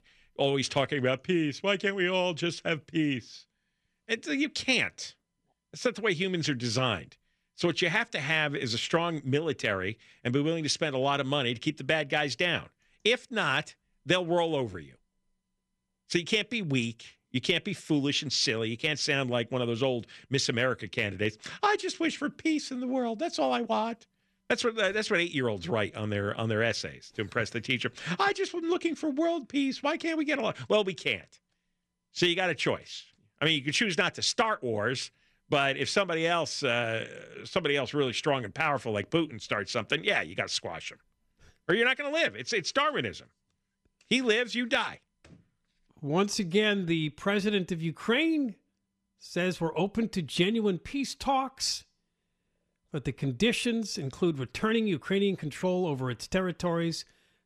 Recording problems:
none

